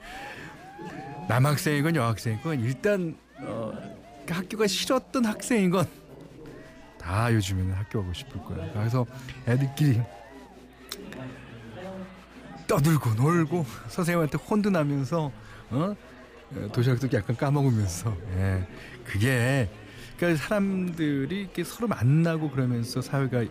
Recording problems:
chatter from many people; noticeable; throughout; 15 dB below the speech

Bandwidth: 15 kHz